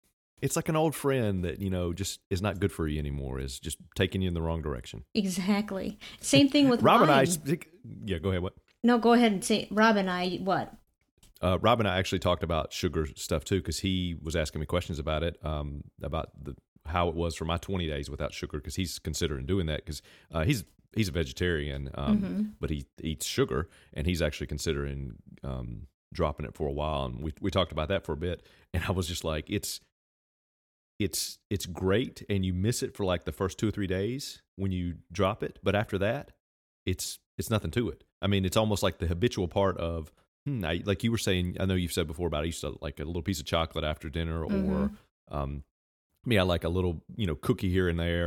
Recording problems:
abrupt cut into speech; at the end

